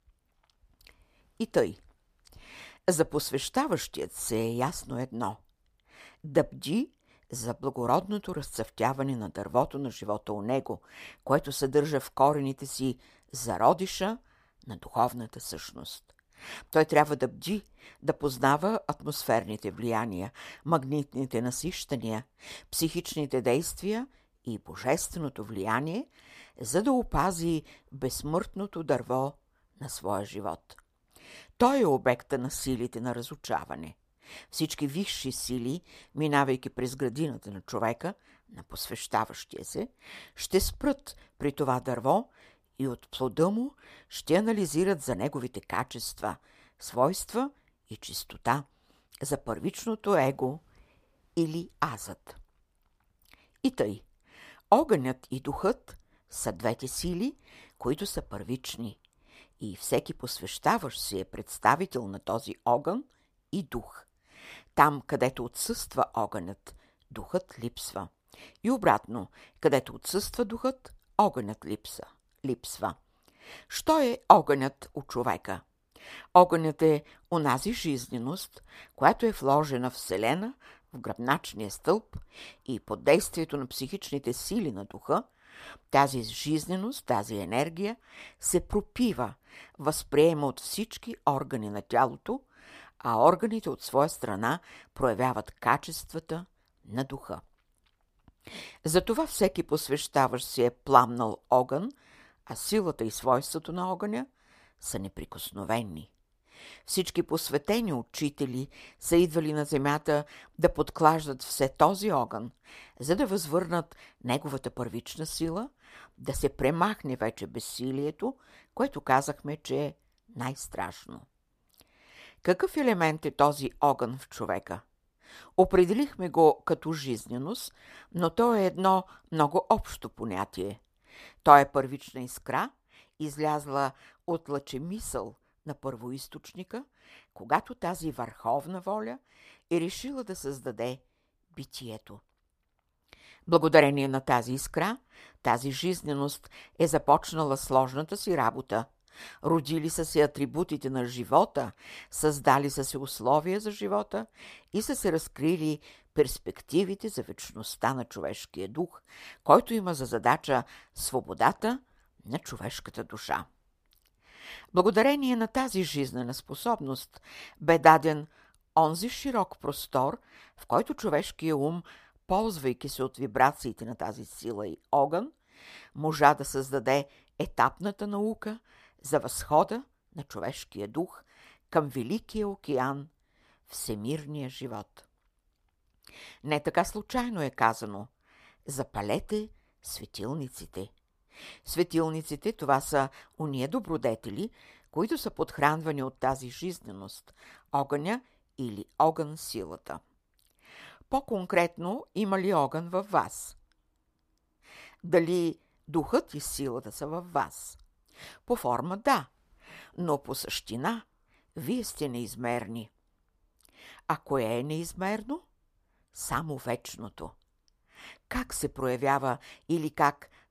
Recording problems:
none

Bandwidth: 15 kHz